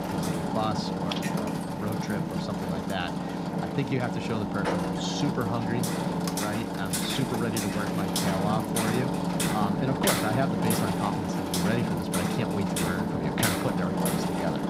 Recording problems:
machinery noise; very loud; throughout; 4 dB above the speech

